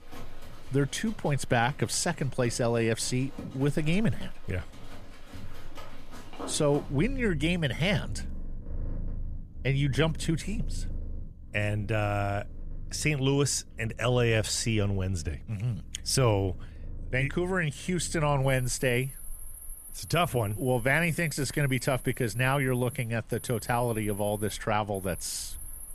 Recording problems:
animal sounds; noticeable; throughout; 15 dB below the speech

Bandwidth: 14.5 kHz